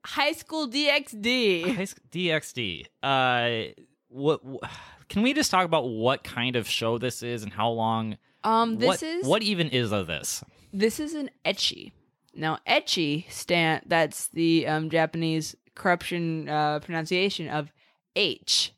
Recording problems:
none

